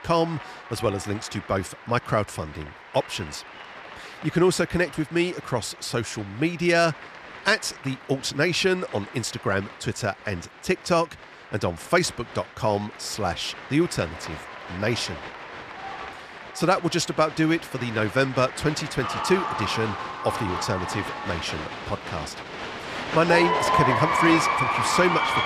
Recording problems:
crowd noise; loud; throughout; 4 dB below the speech

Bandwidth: 14.5 kHz